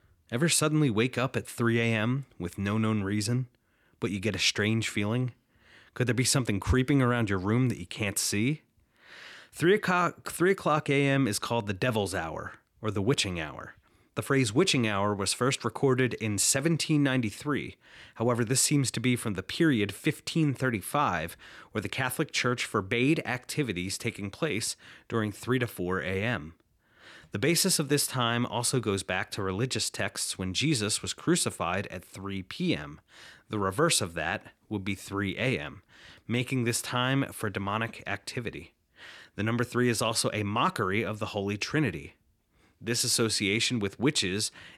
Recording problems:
none

